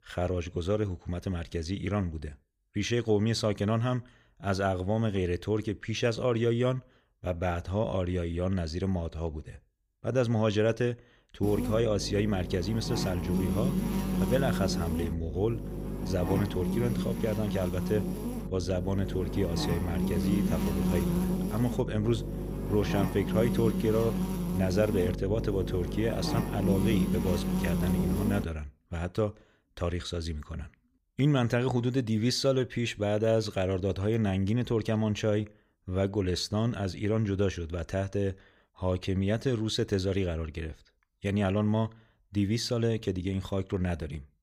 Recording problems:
electrical hum; loud; from 11 to 28 s; 50 Hz, 5 dB below the speech

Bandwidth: 15.5 kHz